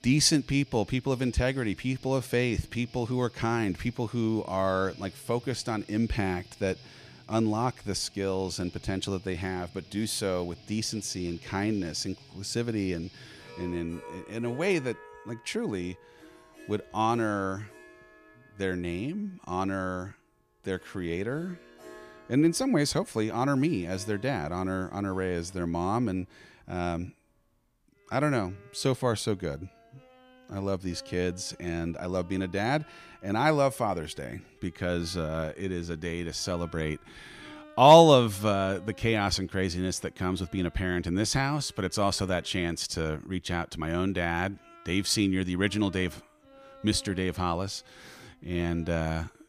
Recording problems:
background music; faint; throughout; 25 dB below the speech

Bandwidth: 15 kHz